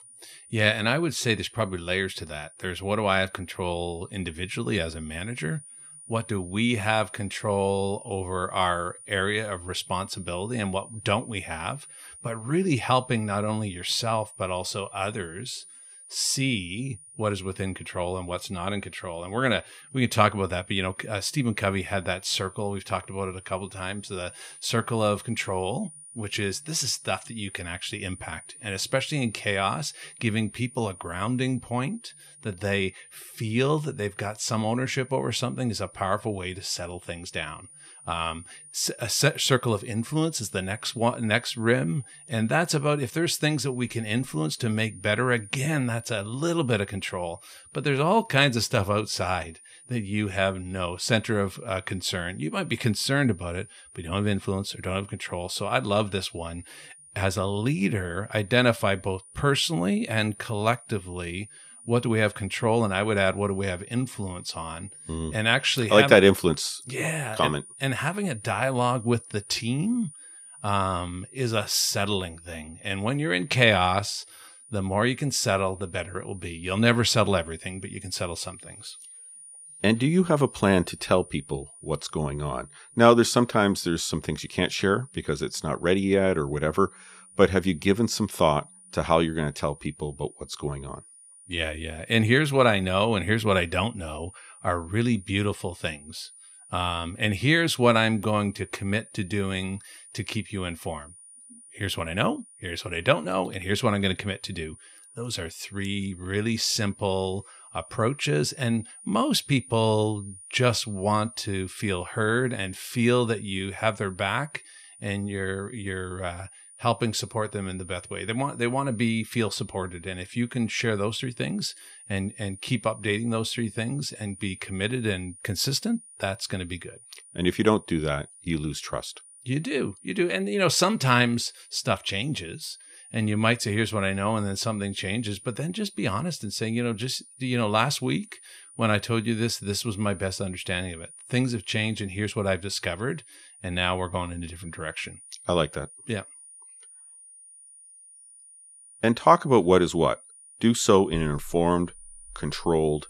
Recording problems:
high-pitched whine; noticeable; throughout; 9.5 kHz, 20 dB below the speech

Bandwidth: 15.5 kHz